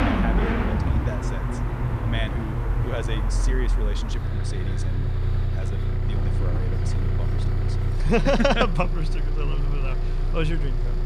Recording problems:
traffic noise; very loud; throughout; 3 dB above the speech

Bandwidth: 14.5 kHz